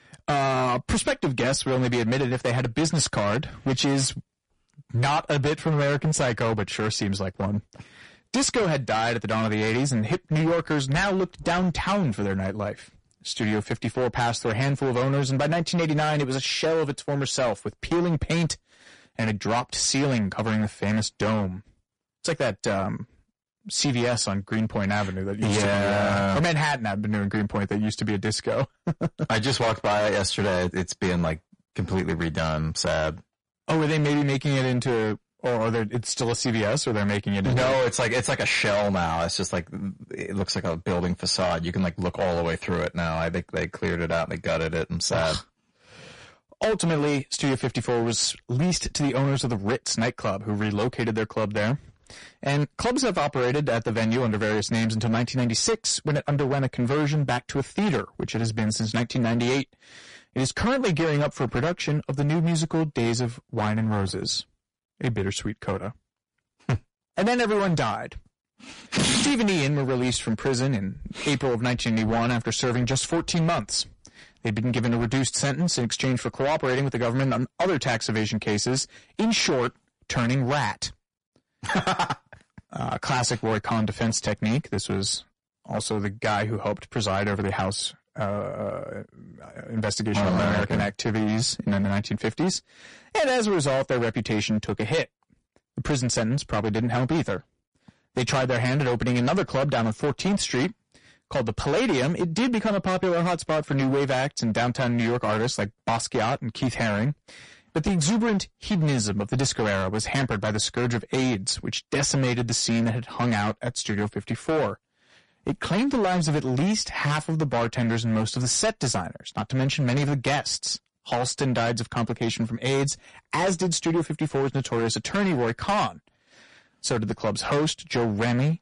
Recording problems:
distortion; heavy; 16% of the sound clipped
garbled, watery; slightly; nothing above 10.5 kHz

